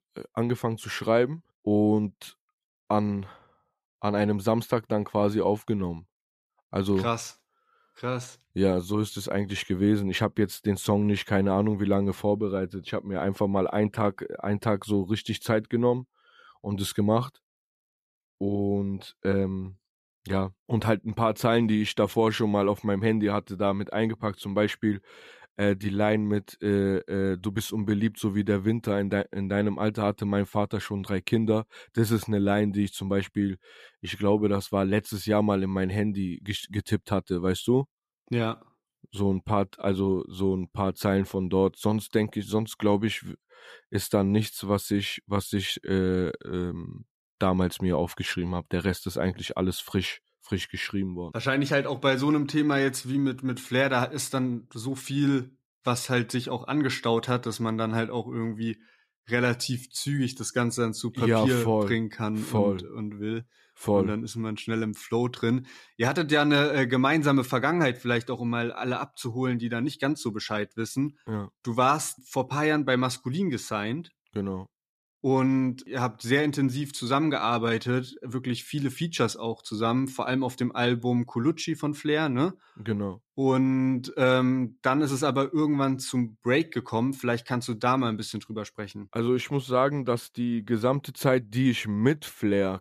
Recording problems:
none

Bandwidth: 14.5 kHz